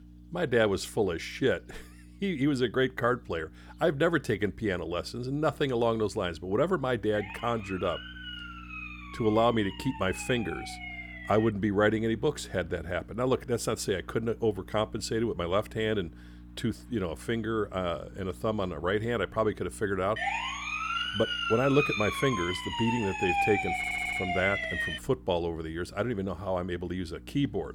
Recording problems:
electrical hum; faint; throughout; 60 Hz, 30 dB below the speech
siren; noticeable; from 7 to 12 s; peak 10 dB below the speech
siren; loud; from 20 to 25 s; peak 3 dB above the speech
audio stuttering; at 24 s

